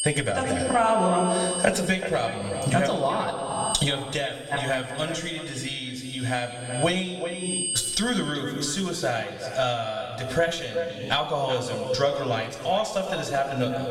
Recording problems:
echo of what is said; strong; throughout; 380 ms later, 10 dB below the speech
off-mic speech; far
squashed, flat; heavily
room echo; noticeable; dies away in 1.1 s
high-pitched whine; loud; until 8.5 s; 8.5 kHz, 7 dB below the speech

